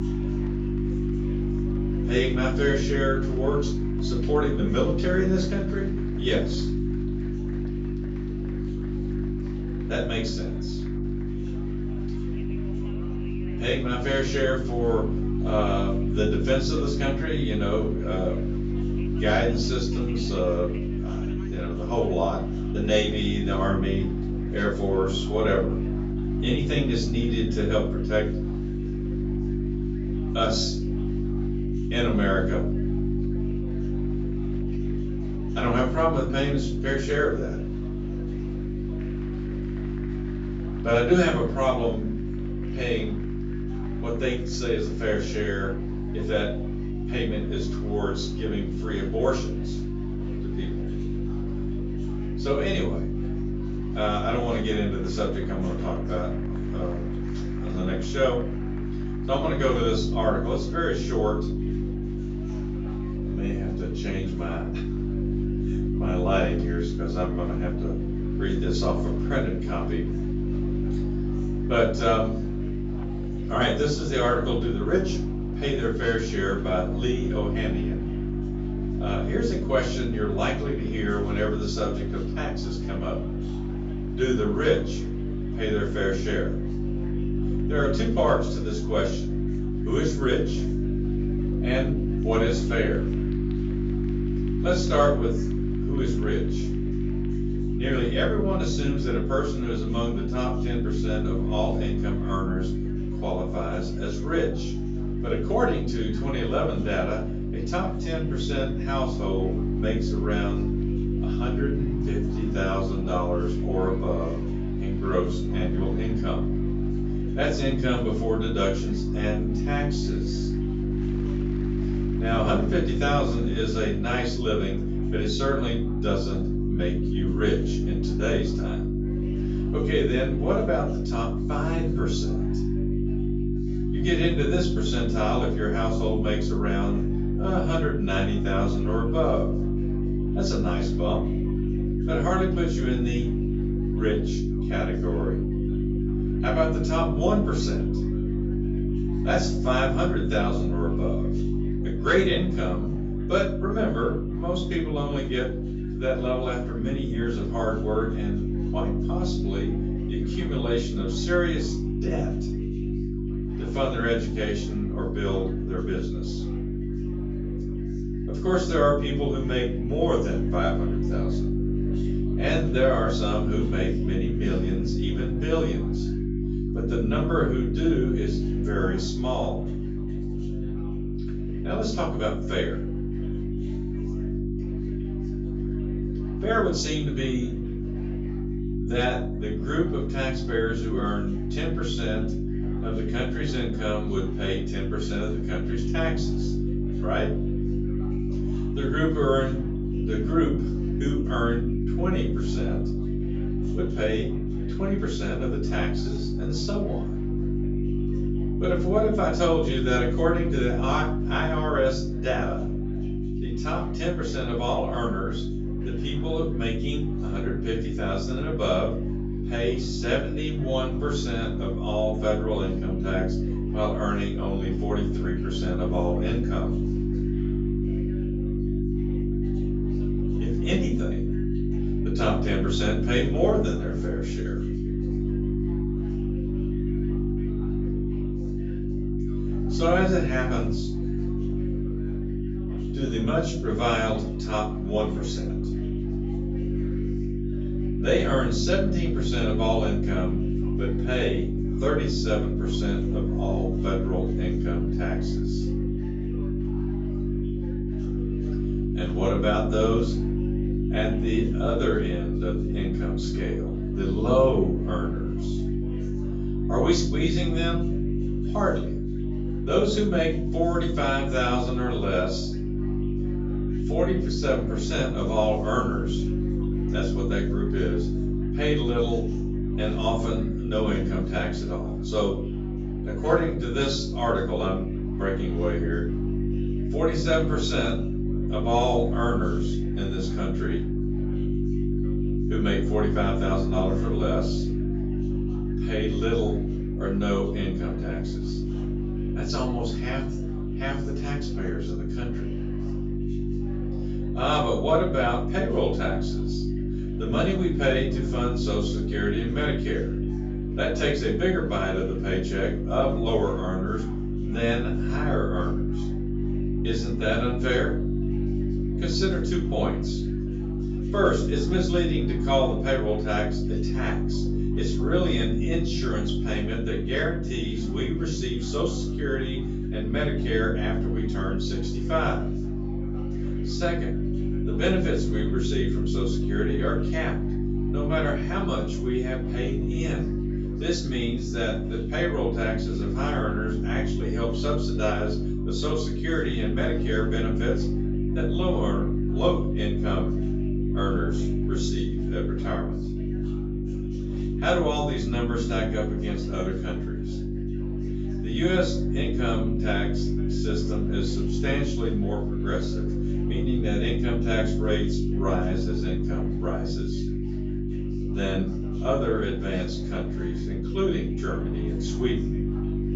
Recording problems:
off-mic speech; far
room echo; noticeable; dies away in 0.4 s
high frequencies cut off; noticeable; nothing above 8 kHz
electrical hum; loud; throughout; 50 Hz, 6 dB below the speech
chatter from many people; faint; throughout; 20 dB below the speech

